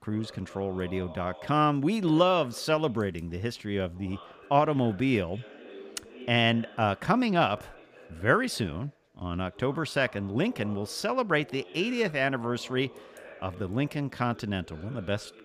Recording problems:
background chatter; faint; throughout; 2 voices, 20 dB below the speech

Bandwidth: 15 kHz